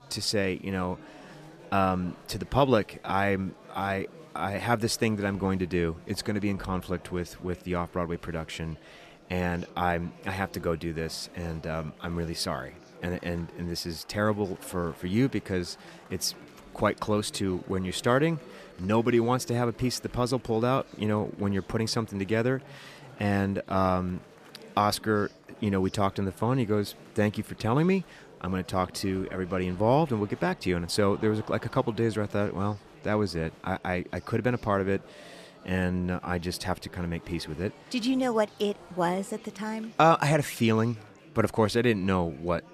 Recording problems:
murmuring crowd; faint; throughout; 20 dB below the speech

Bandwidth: 14.5 kHz